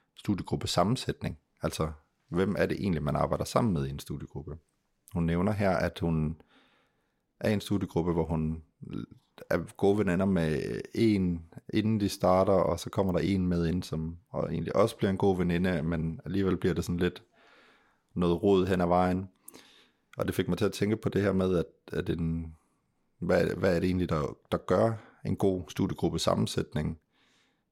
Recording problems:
none

